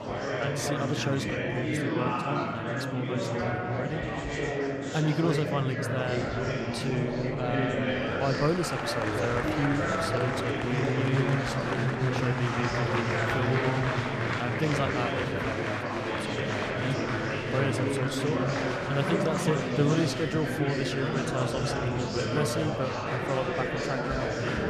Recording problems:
murmuring crowd; very loud; throughout; 3 dB above the speech

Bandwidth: 14 kHz